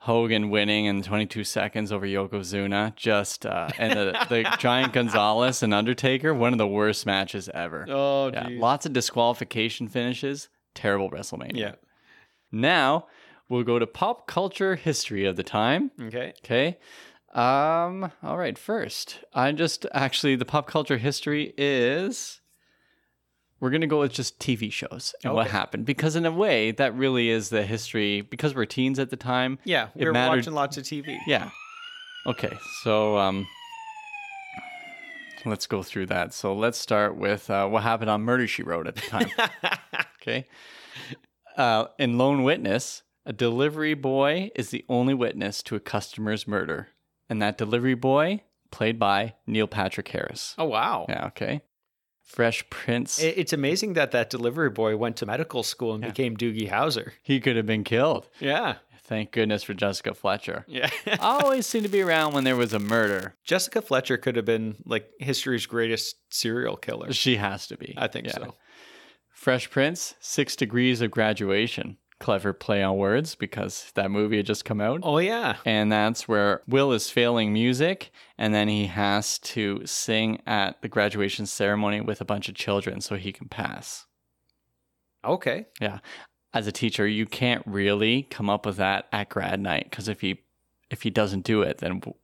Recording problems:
crackling; noticeable; from 1:01 to 1:03; 15 dB below the speech
siren; faint; from 31 to 35 s; peak 10 dB below the speech

